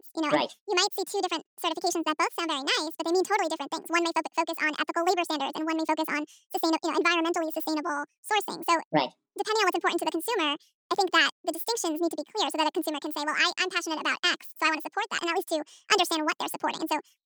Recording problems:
wrong speed and pitch; too fast and too high; 1.7 times normal speed

